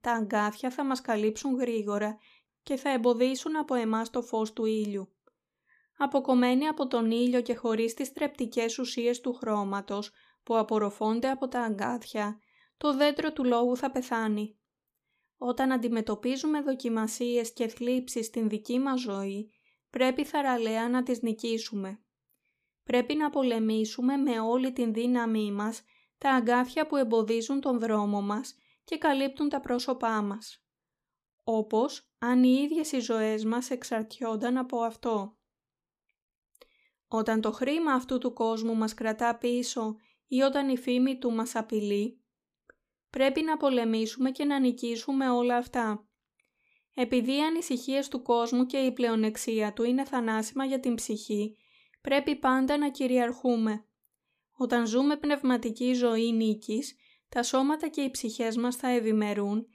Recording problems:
none

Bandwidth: 15 kHz